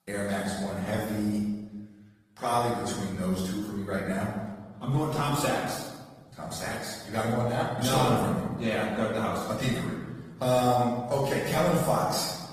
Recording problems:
off-mic speech; far
room echo; noticeable; dies away in 1.1 s
garbled, watery; slightly; nothing above 14.5 kHz

